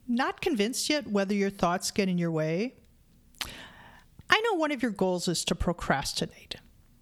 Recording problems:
squashed, flat; somewhat

